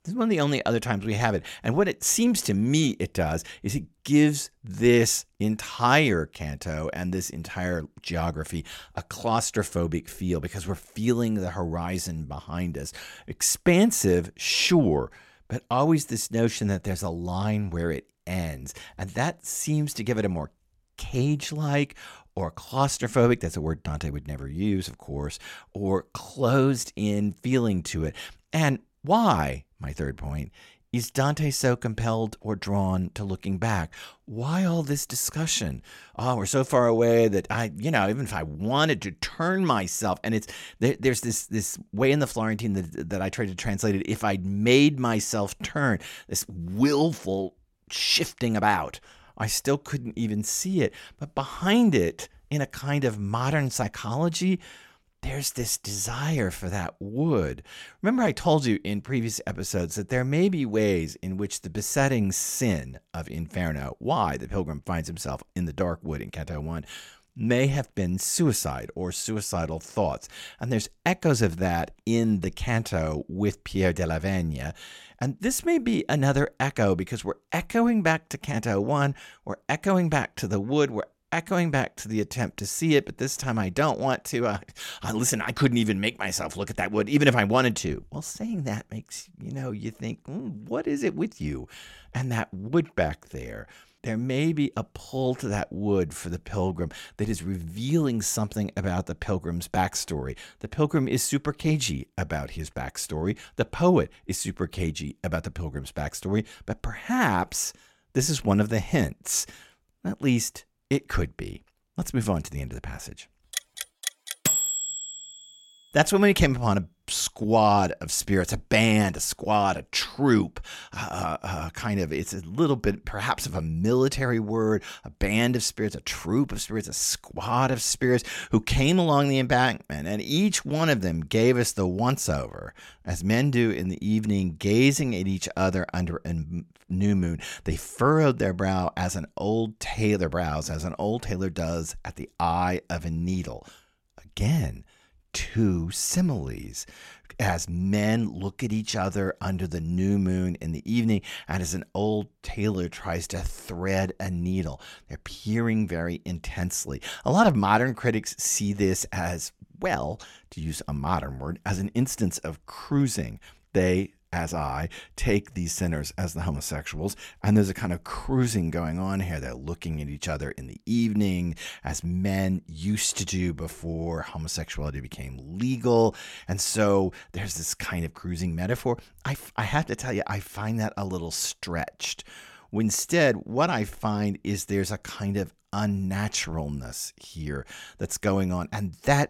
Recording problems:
none

